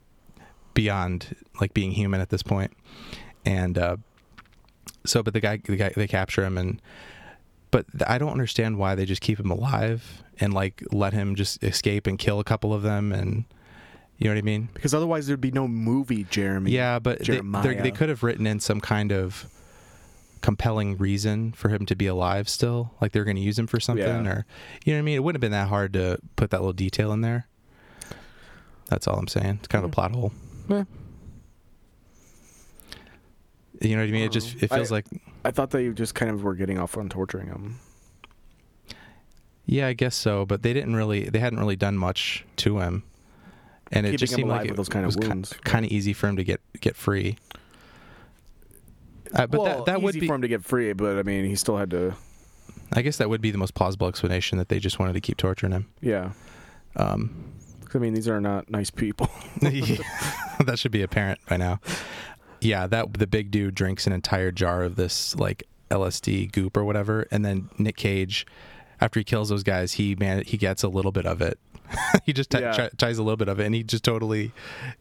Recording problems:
squashed, flat; somewhat

